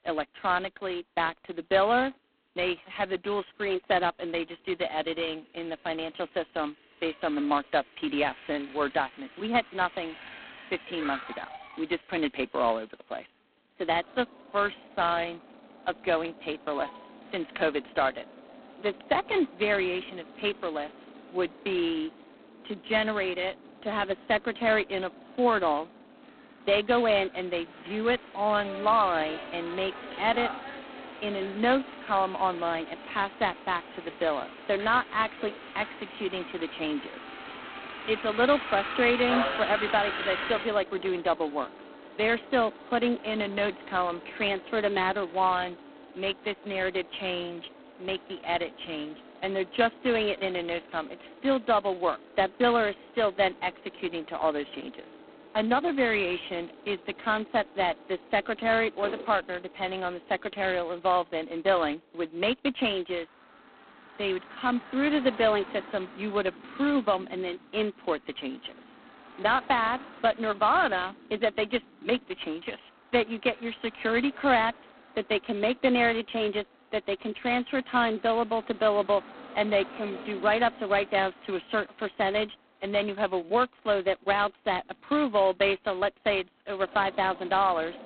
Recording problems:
phone-call audio; poor line; nothing above 4 kHz
traffic noise; noticeable; throughout; 15 dB below the speech

